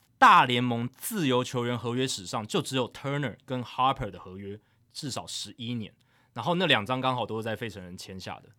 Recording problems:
none

